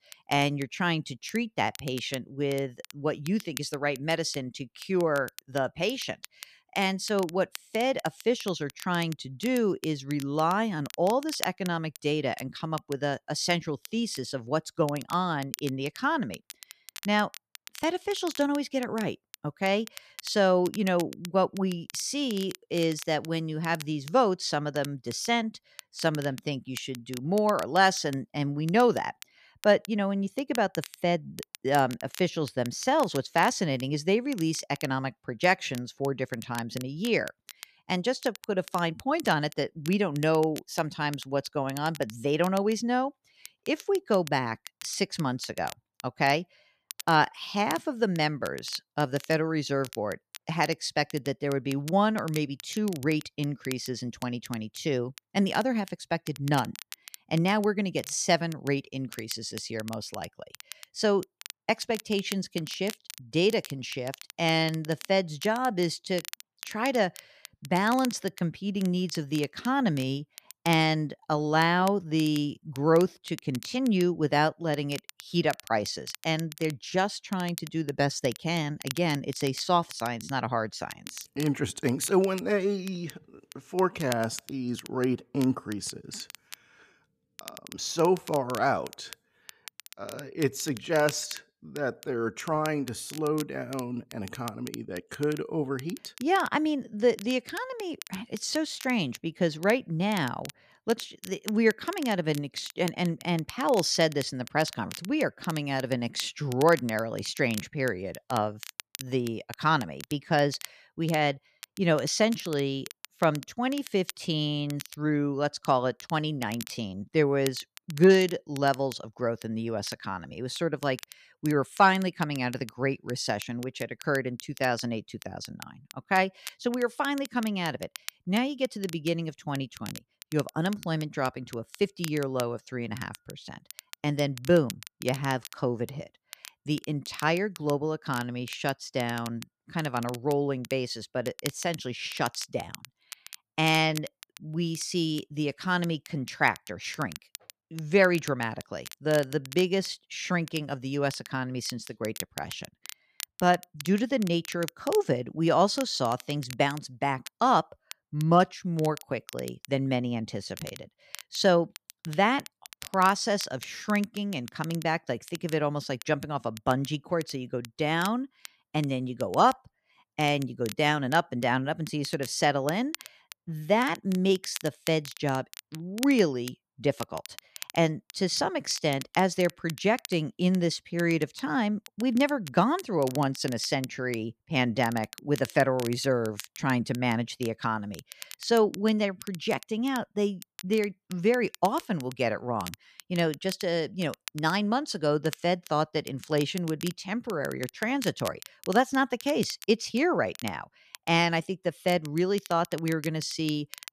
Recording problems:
crackle, like an old record; noticeable; 15 dB below the speech

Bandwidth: 14.5 kHz